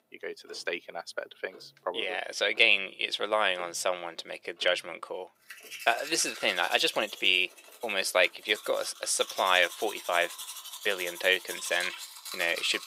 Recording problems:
thin; very; fading below 400 Hz
household noises; noticeable; throughout; 15 dB below the speech

